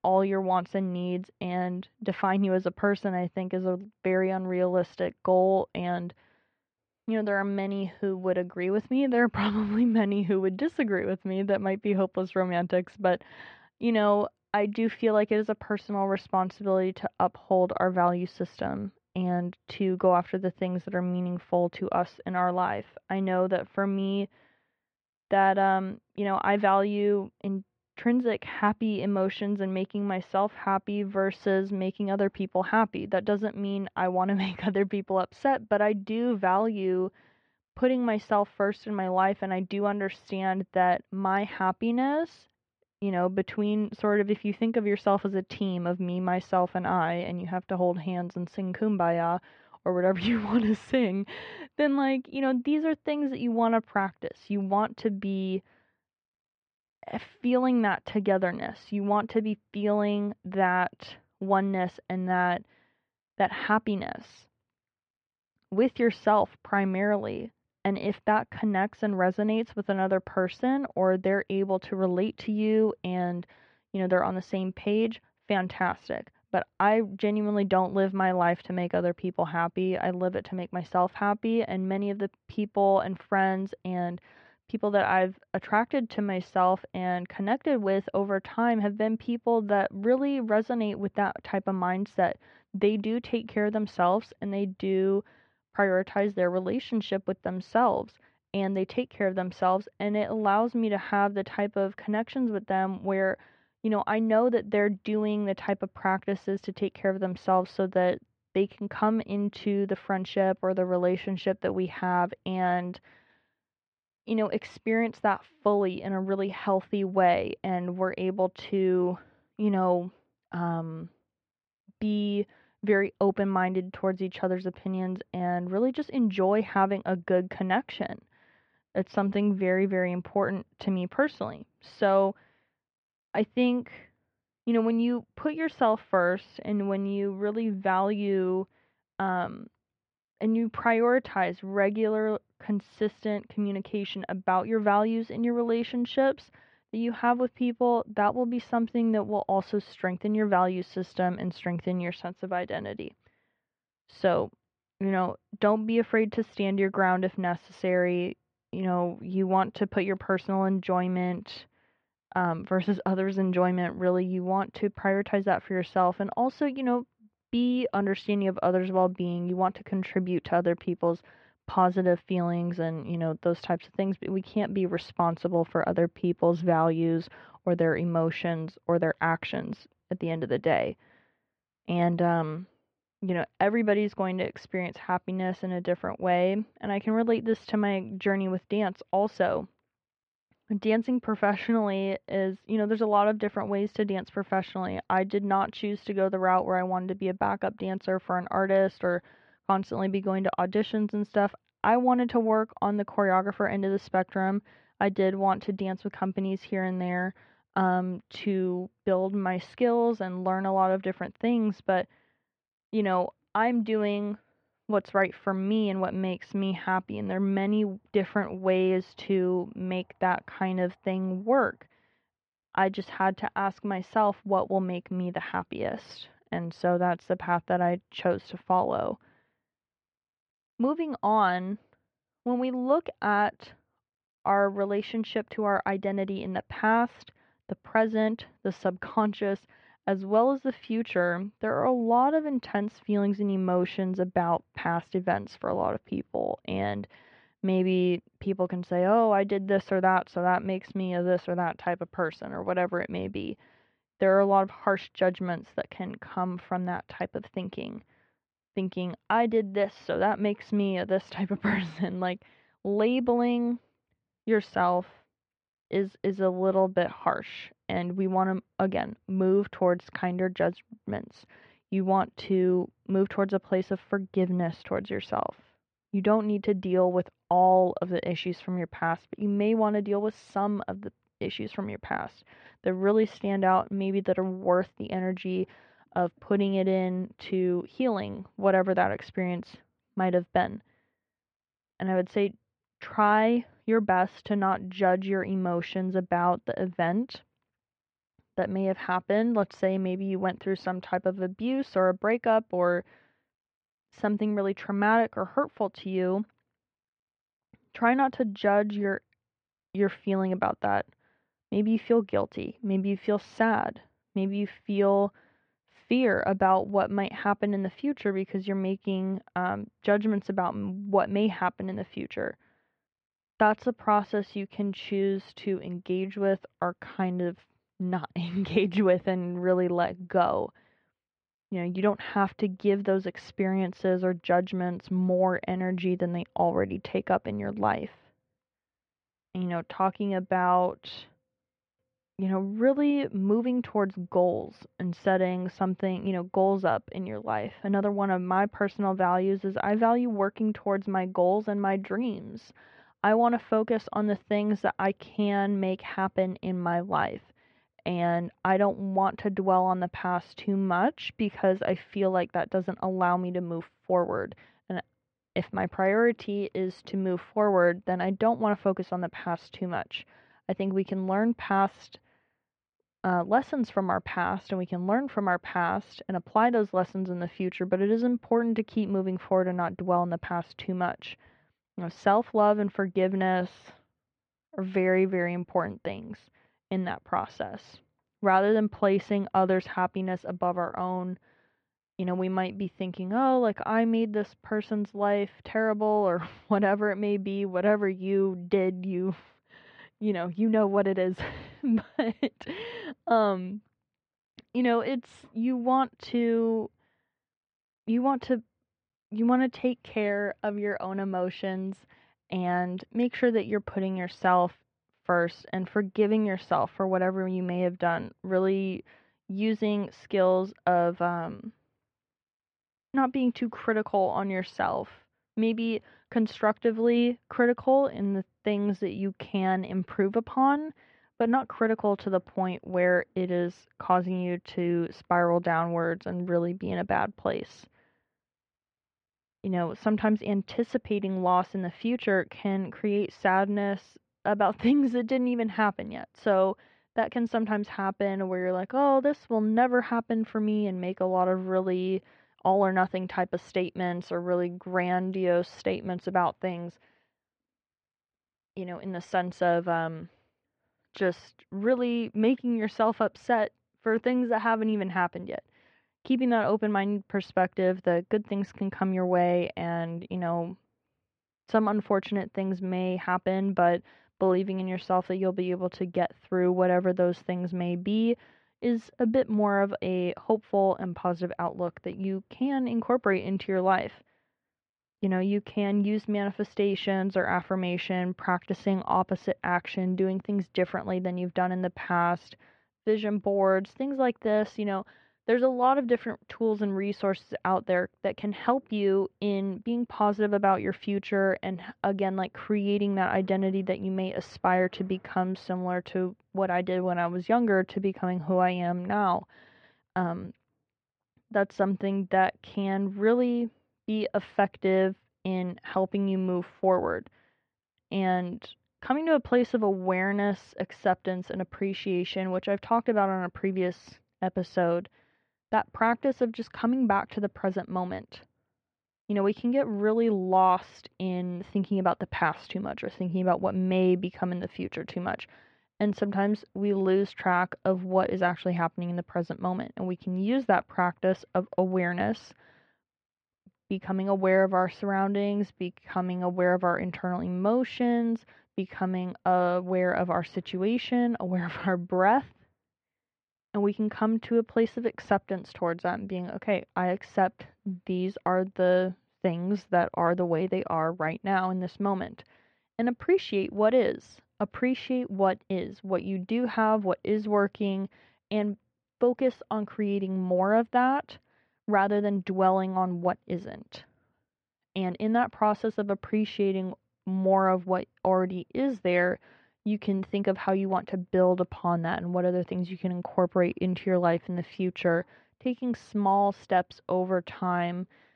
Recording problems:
muffled; very; fading above 2 kHz

